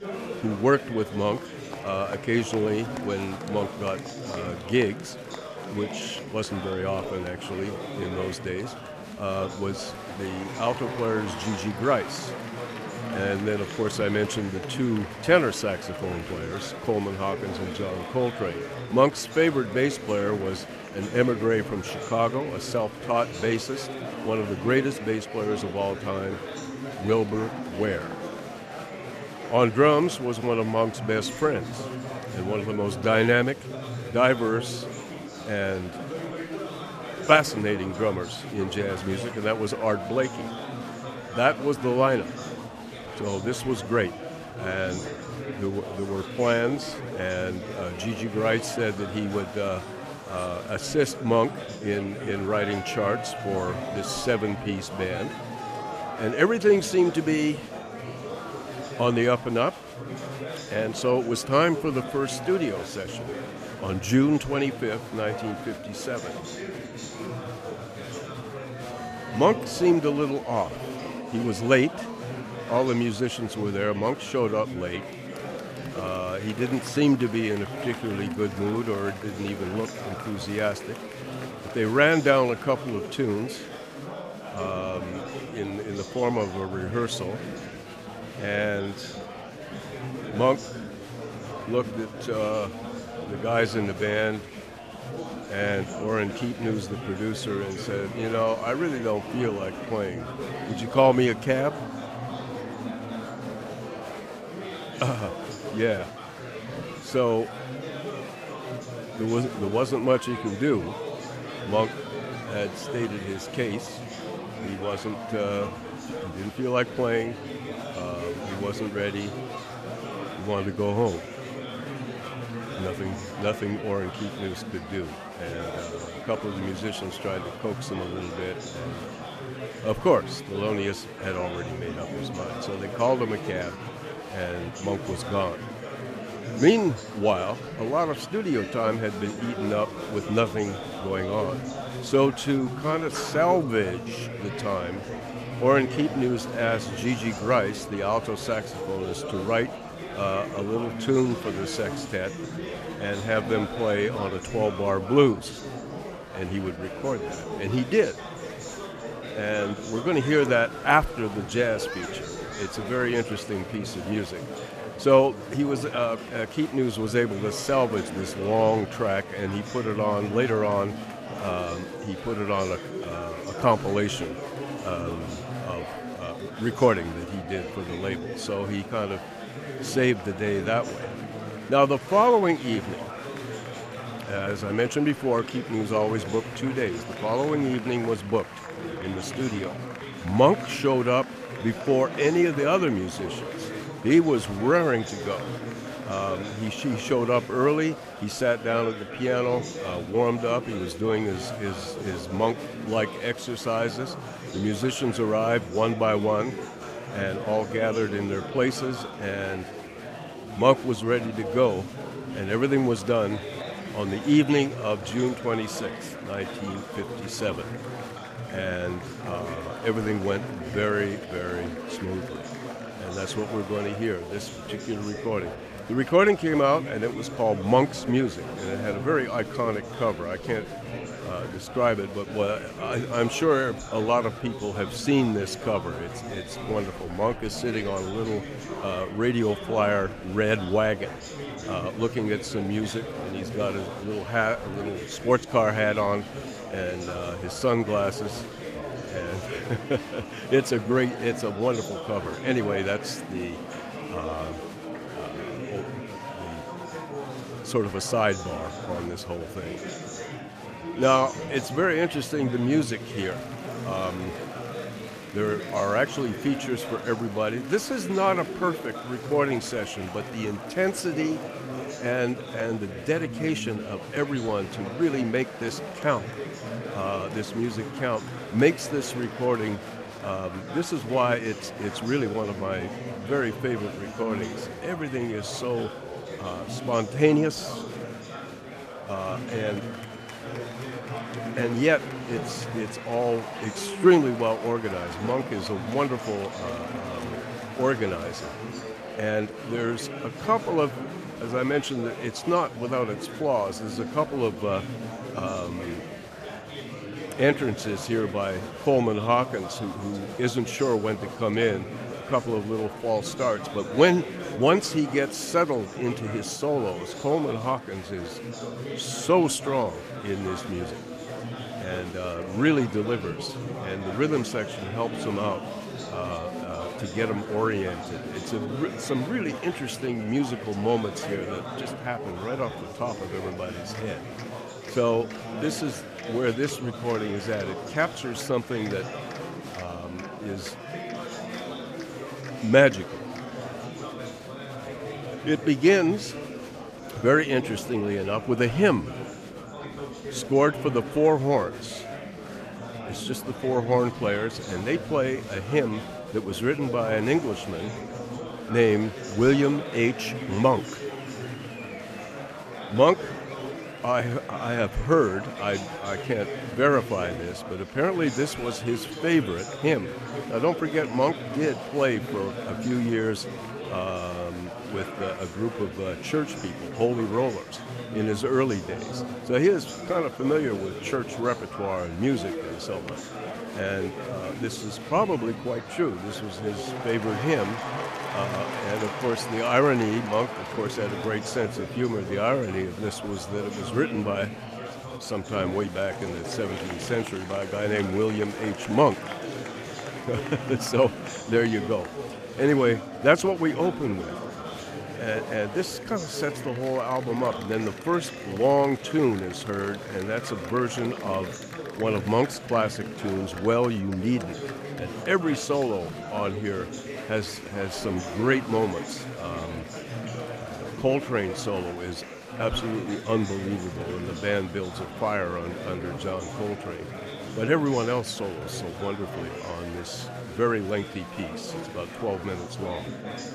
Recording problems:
chatter from many people; loud; throughout; 9 dB below the speech

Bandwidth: 14.5 kHz